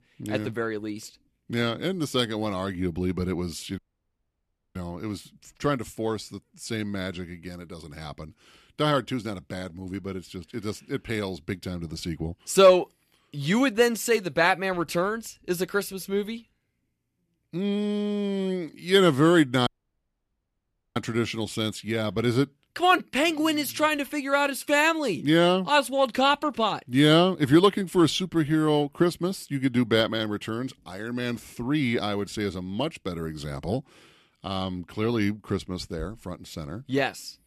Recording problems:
audio cutting out; at 4 s for 1 s and at 20 s for 1.5 s

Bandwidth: 14 kHz